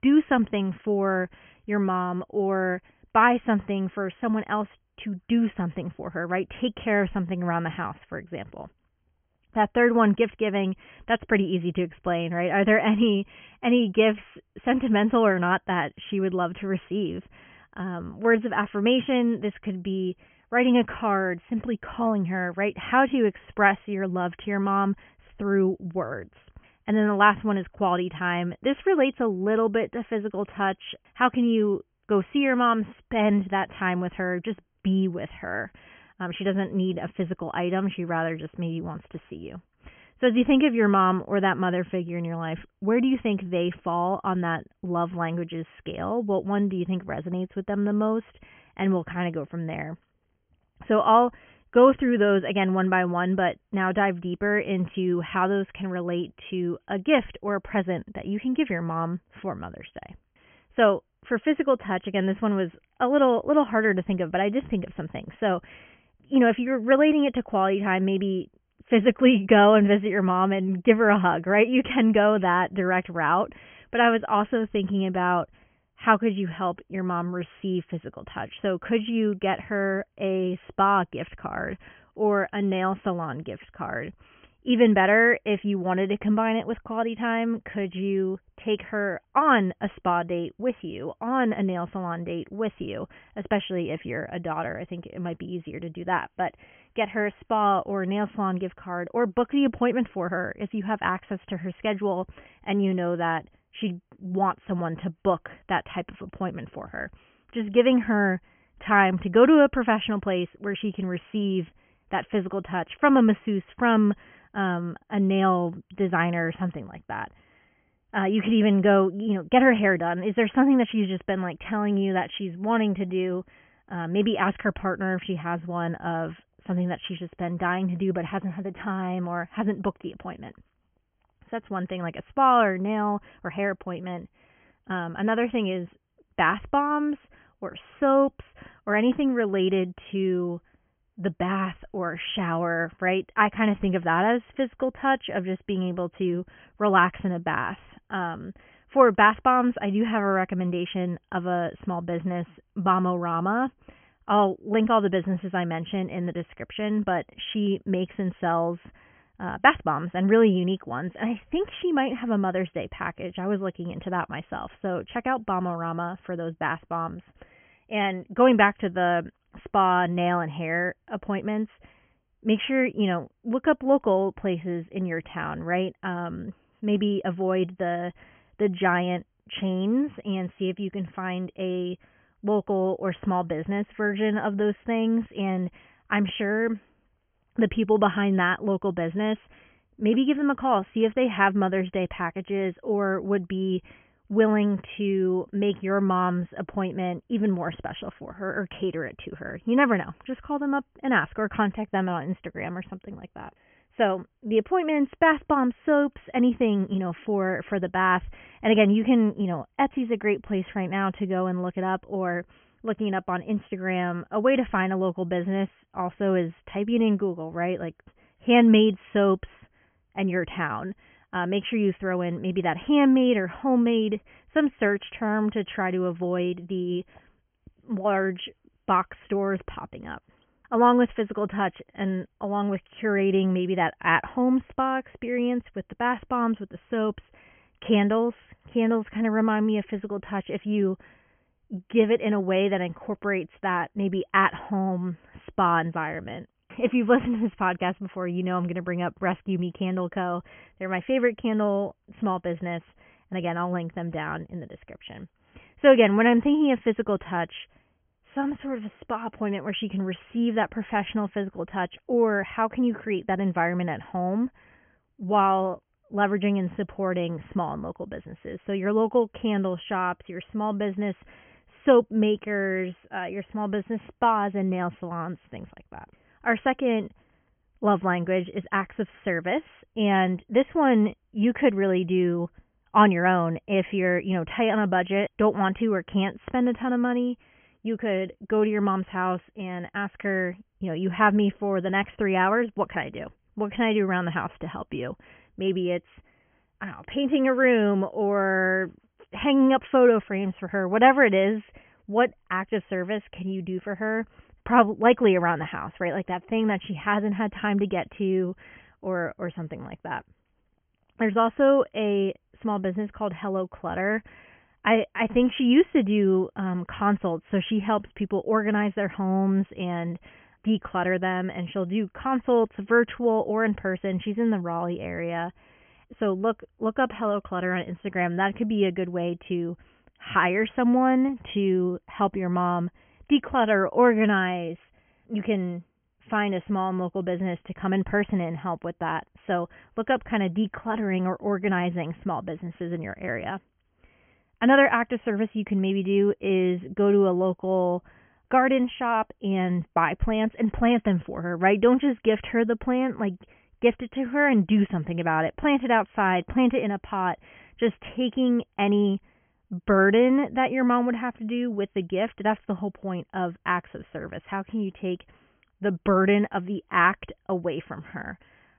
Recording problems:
high frequencies cut off; severe; nothing above 3.5 kHz

